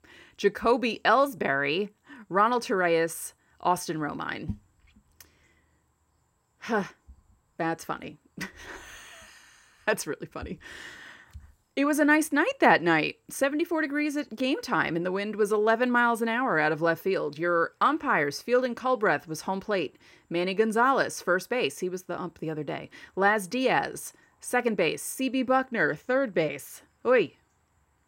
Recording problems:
none

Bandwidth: 16 kHz